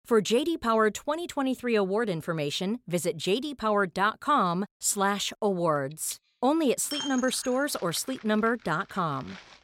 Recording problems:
household noises; noticeable; from 6 s on; 15 dB below the speech

